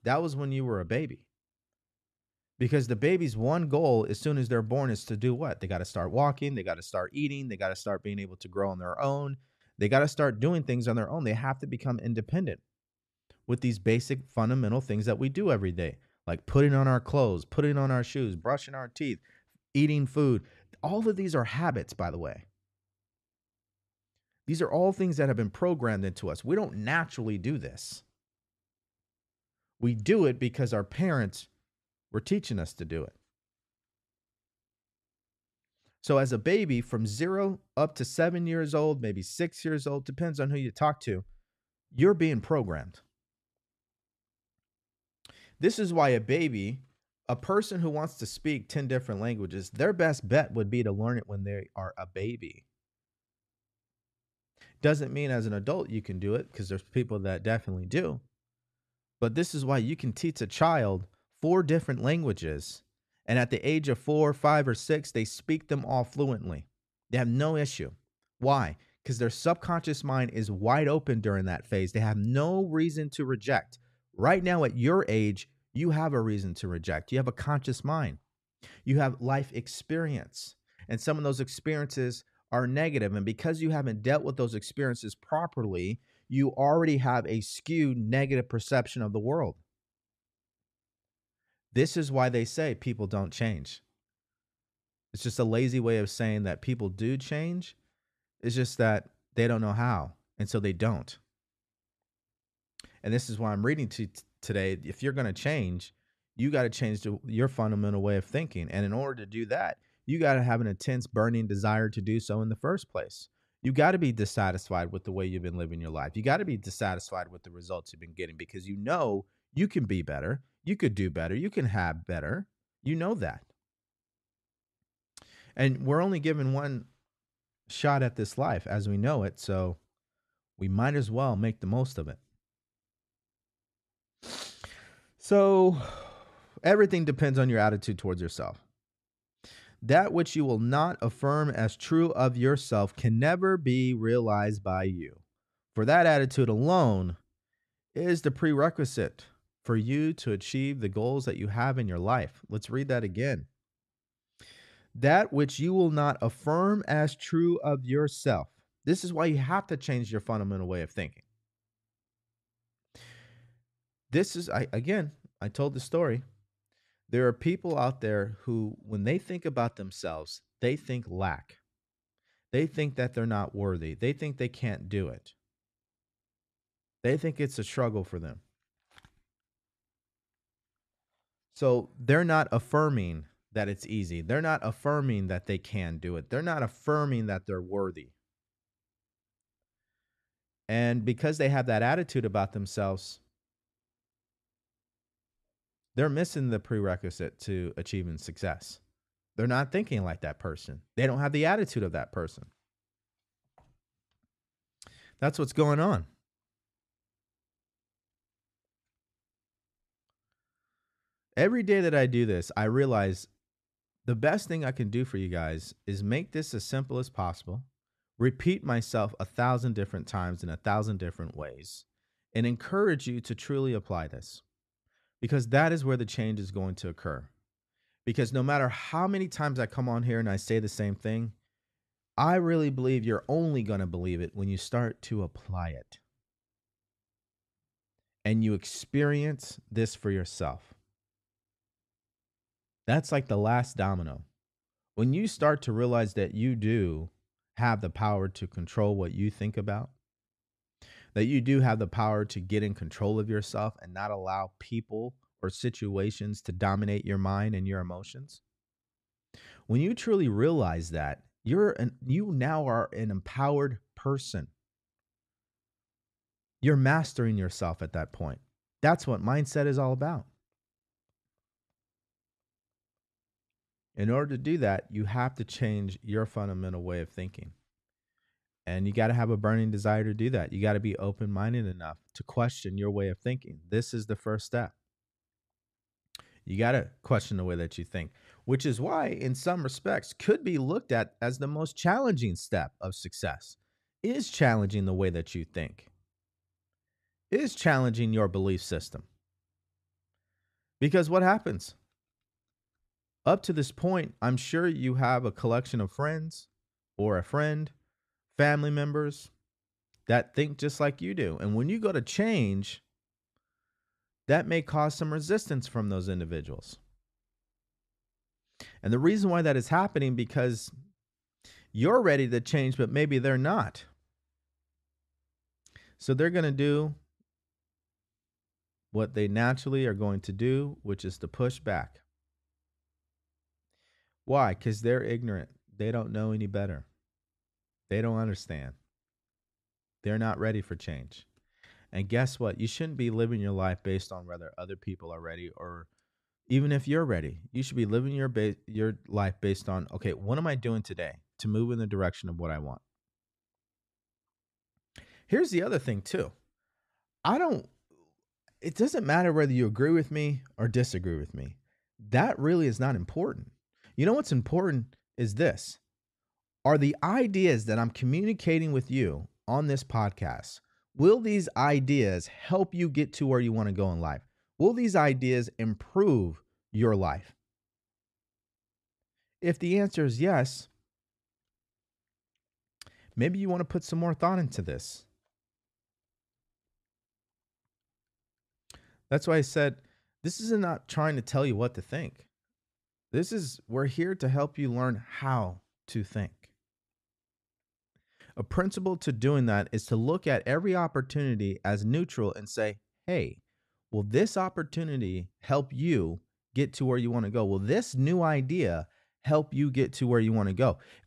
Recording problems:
none

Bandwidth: 13.5 kHz